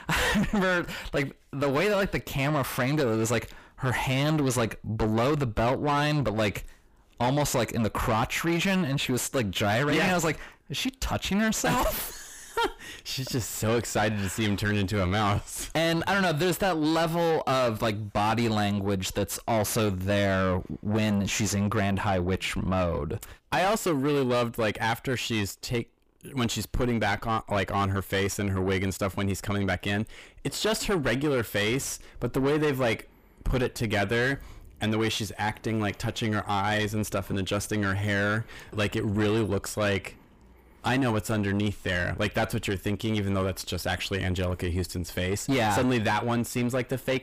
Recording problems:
distortion; heavy; 6 dB below the speech

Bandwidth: 15 kHz